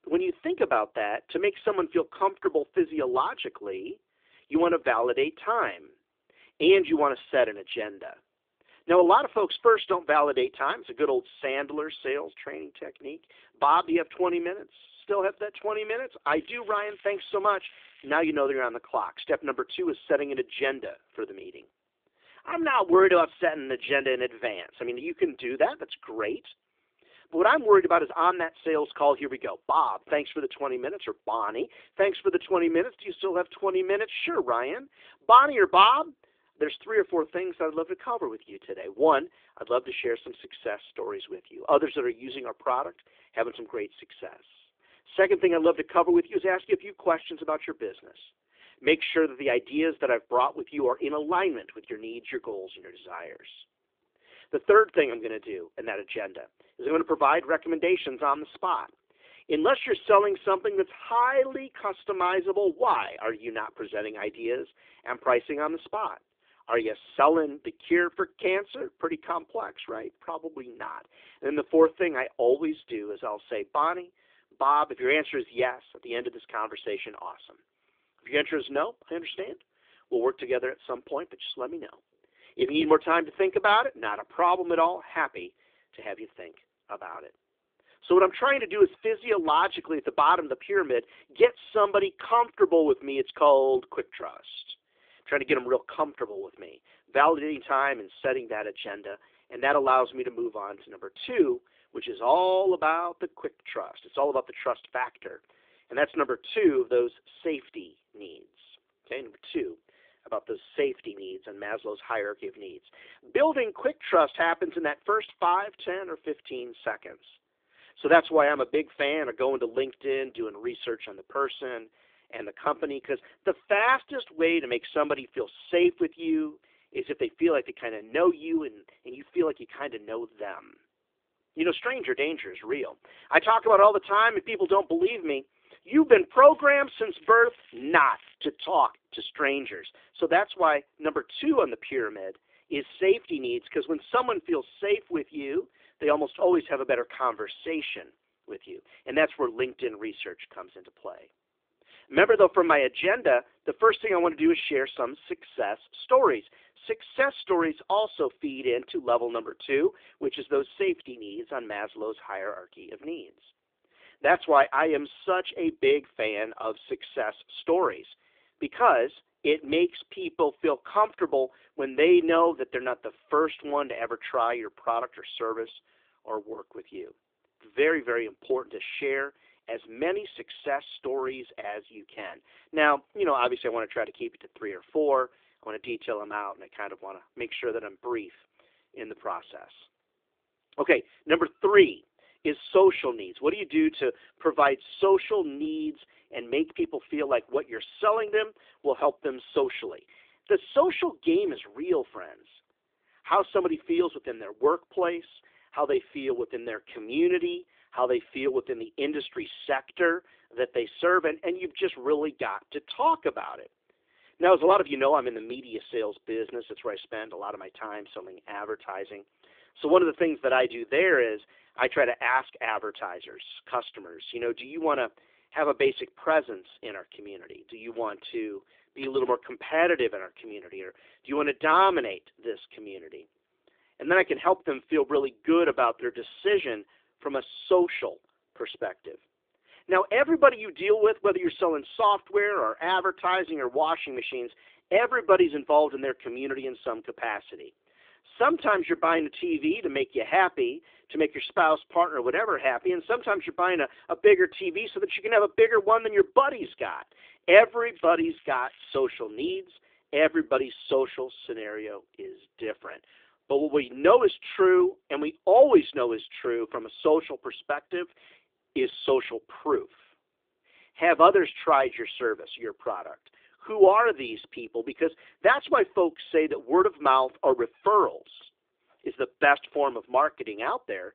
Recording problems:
phone-call audio; nothing above 3.5 kHz
crackling; faint; from 16 to 18 s, from 2:16 to 2:18 and from 4:18 to 4:19; 25 dB below the speech

